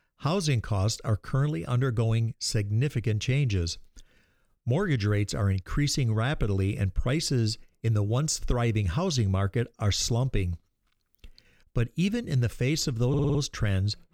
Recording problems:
audio stuttering; at 13 s

